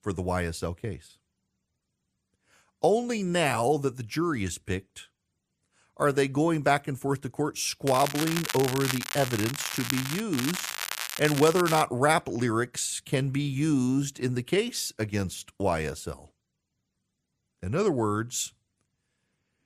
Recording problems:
crackling; loud; from 8 to 10 s and from 10 to 12 s; 5 dB below the speech

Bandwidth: 14.5 kHz